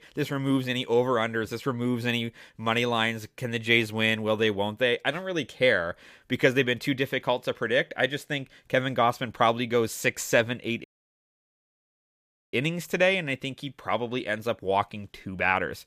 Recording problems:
audio cutting out; at 11 s for 1.5 s

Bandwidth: 15 kHz